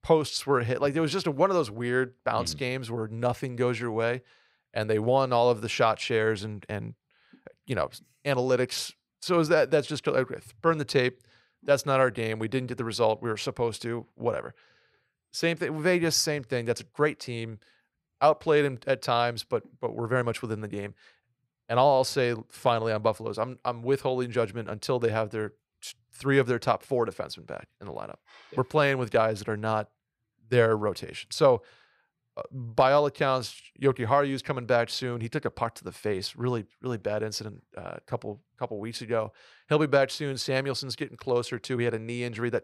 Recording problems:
none

